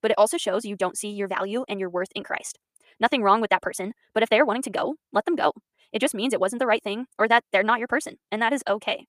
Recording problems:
wrong speed, natural pitch; too fast; 1.5 times normal speed

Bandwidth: 15 kHz